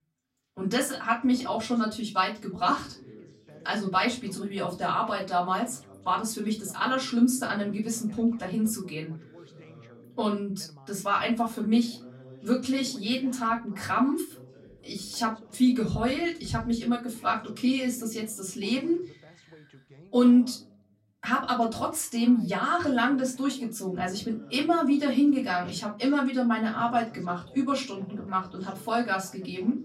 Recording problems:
off-mic speech; far
room echo; very slight; dies away in 0.3 s
background chatter; faint; throughout; 2 voices, 25 dB below the speech

